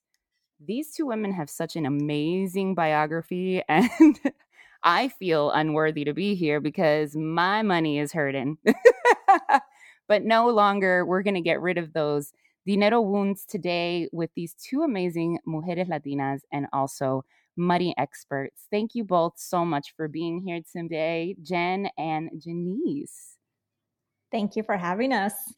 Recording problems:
none

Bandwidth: 17.5 kHz